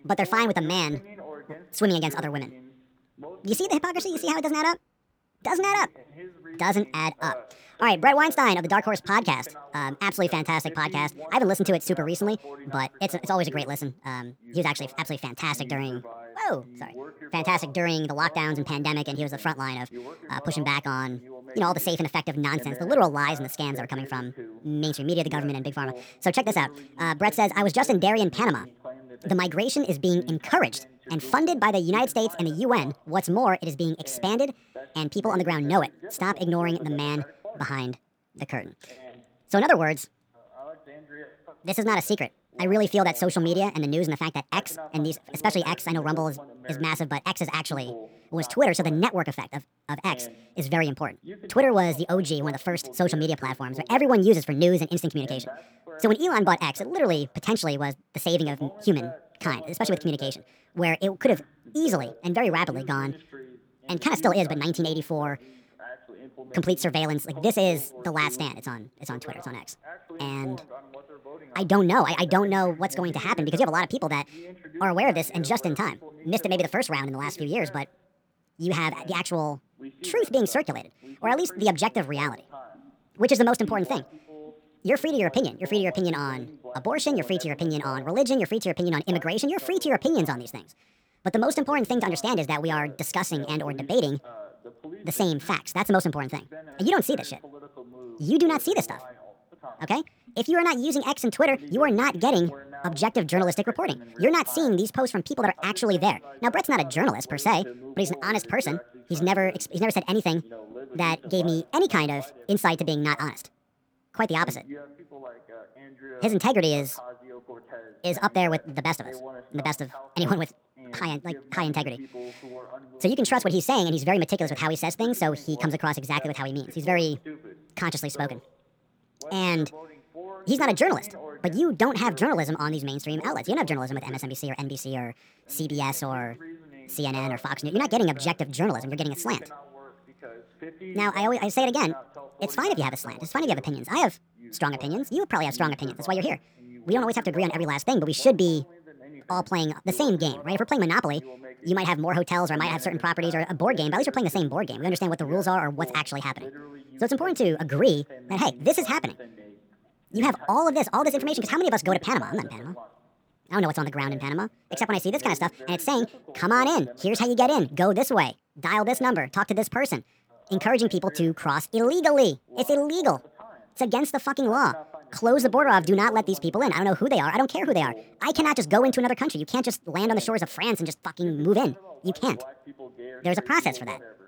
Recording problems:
wrong speed and pitch; too fast and too high; 1.5 times normal speed
voice in the background; noticeable; throughout; 20 dB below the speech

